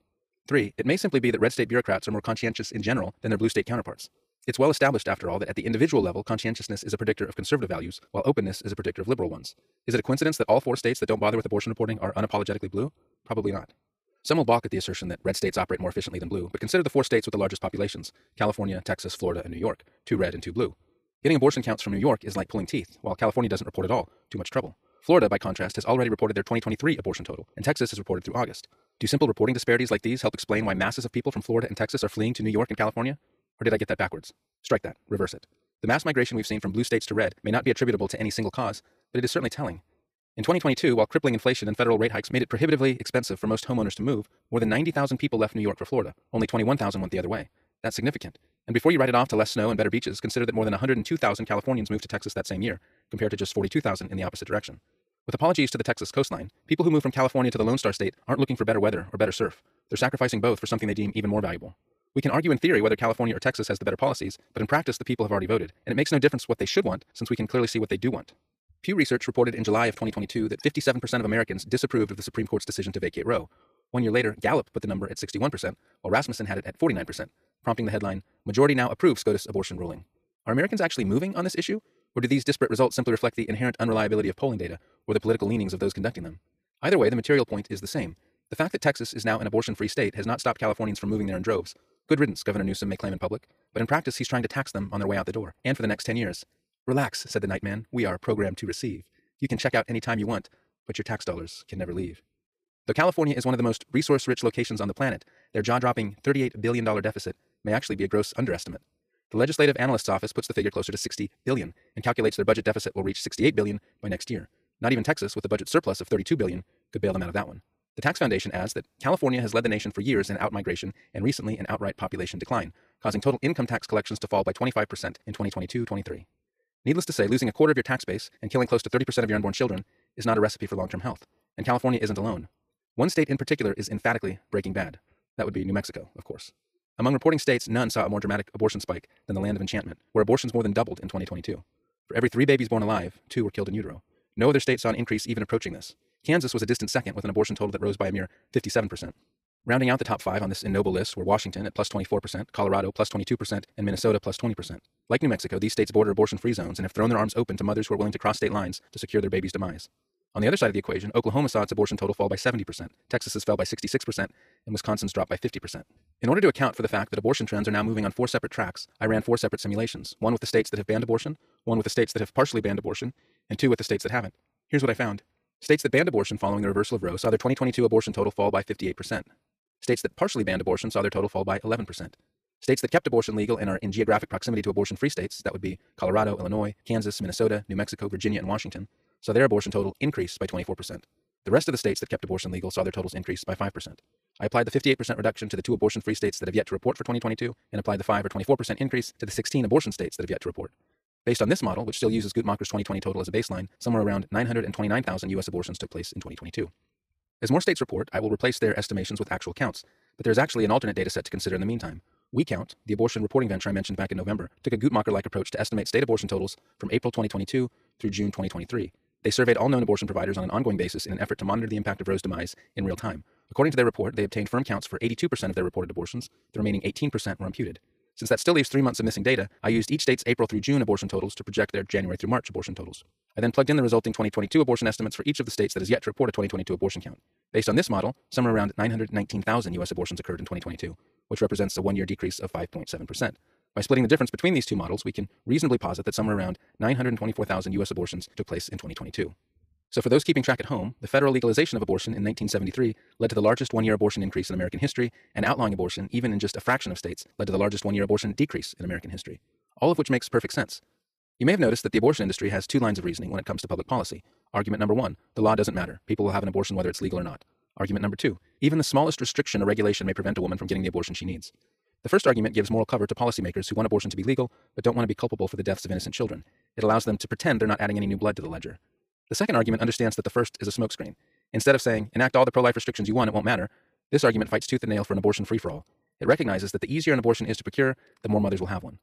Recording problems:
wrong speed, natural pitch; too fast; 1.7 times normal speed

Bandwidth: 15 kHz